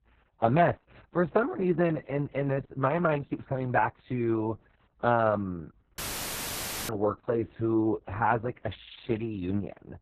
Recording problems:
garbled, watery; badly; nothing above 4 kHz
muffled; very slightly; fading above 2 kHz
audio cutting out; filled with static; at 6 s for 1 s

